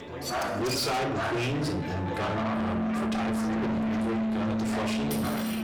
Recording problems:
distortion; heavy; 6 dB below the speech
room echo; slight; dies away in 0.4 s
off-mic speech; somewhat distant
background music; very loud; throughout; 2 dB above the speech
chatter from many people; loud; throughout; 3 dB below the speech
clattering dishes; noticeable; at 0.5 s and at 5 s; peak 2 dB below the speech

